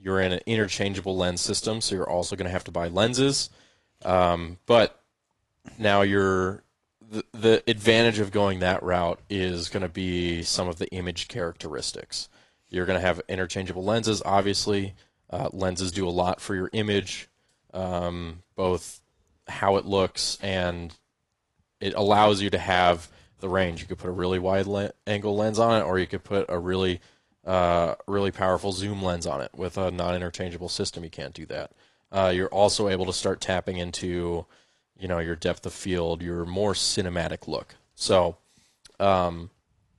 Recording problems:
garbled, watery; slightly

